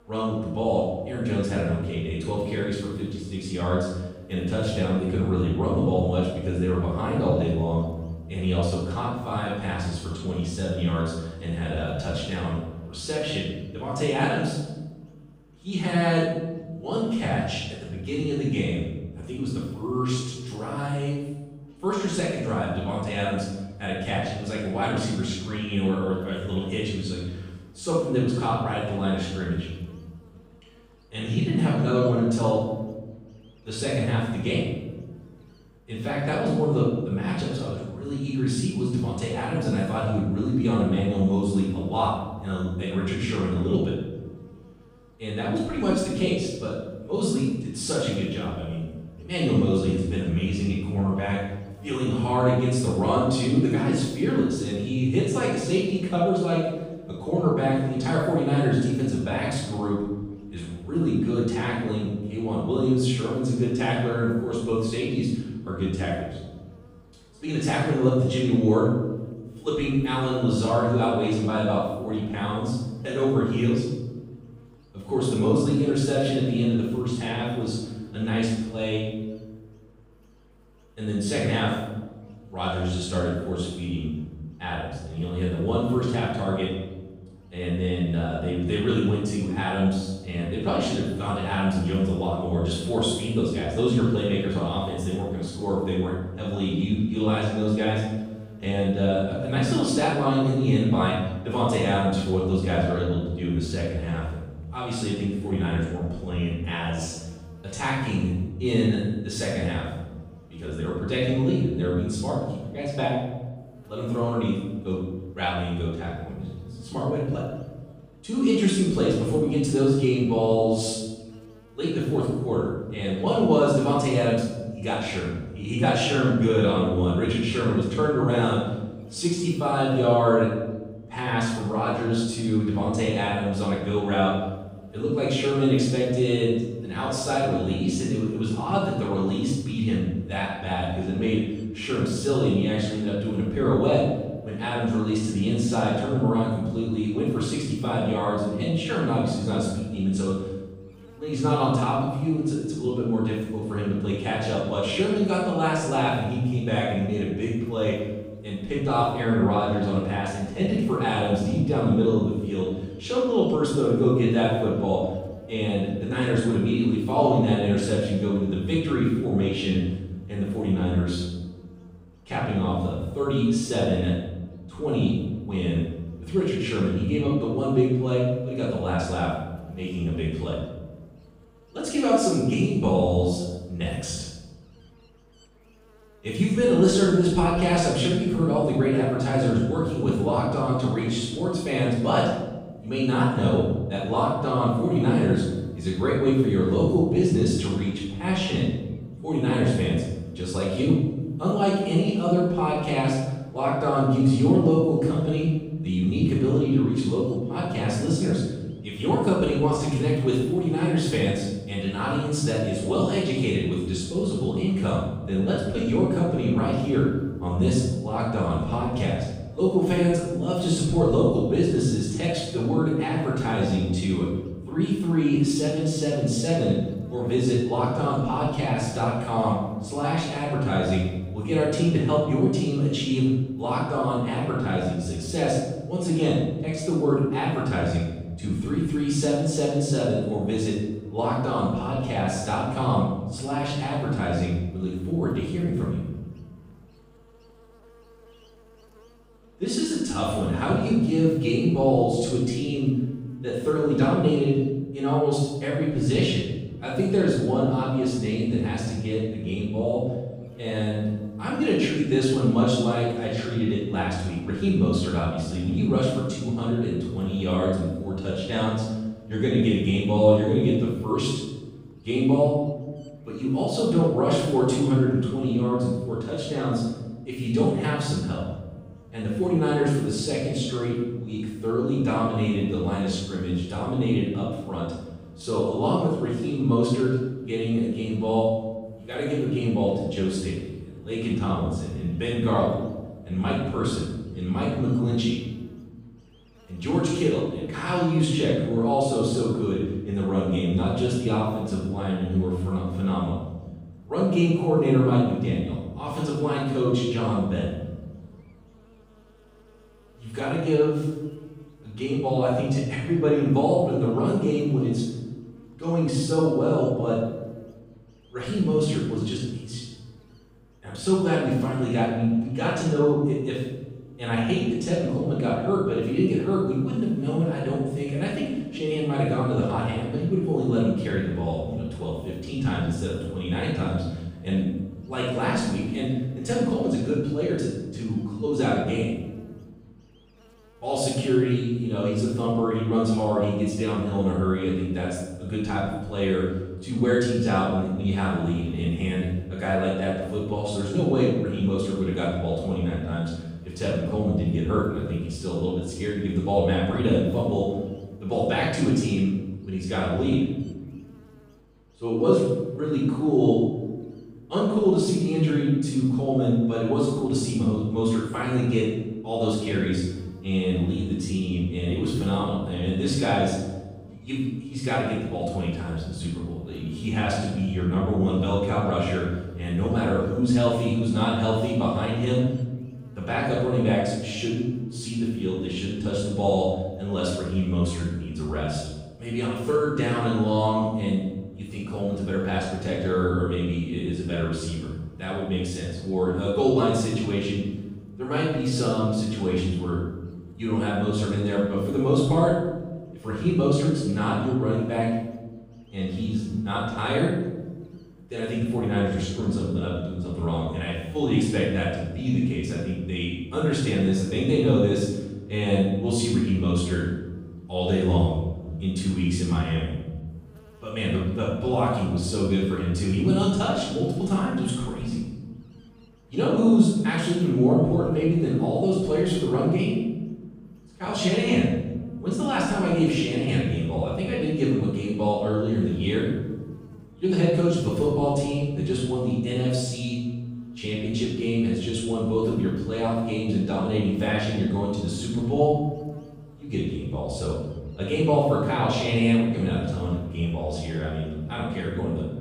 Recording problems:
room echo; strong; dies away in 1.1 s
off-mic speech; far
electrical hum; faint; throughout; 50 Hz, 30 dB below the speech

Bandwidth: 15.5 kHz